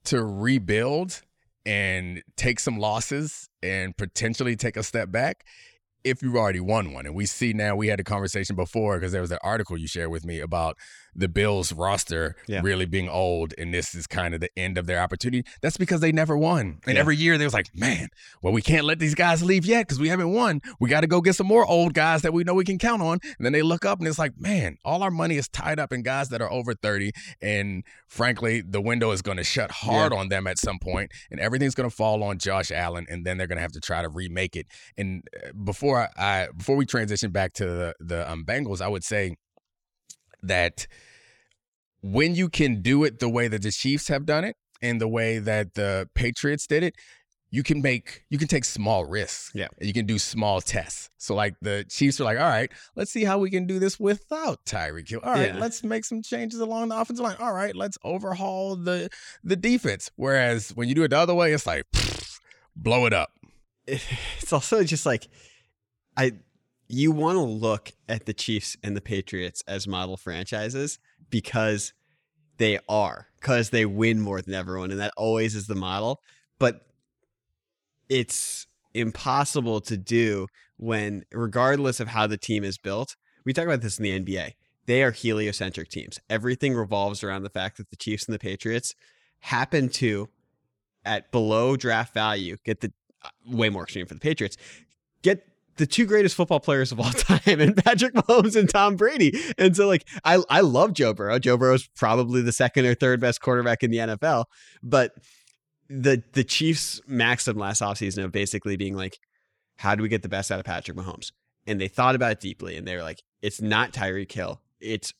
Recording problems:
none

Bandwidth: 18 kHz